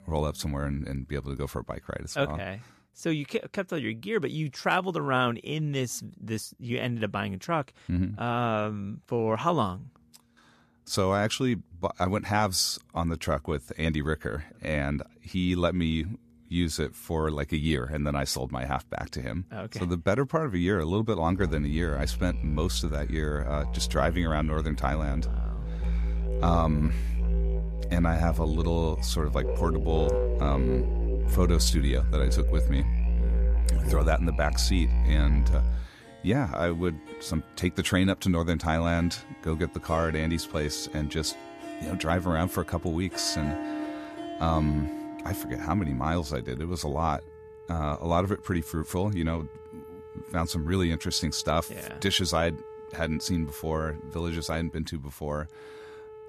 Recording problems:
background music; loud; throughout; 2 dB below the speech

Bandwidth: 14 kHz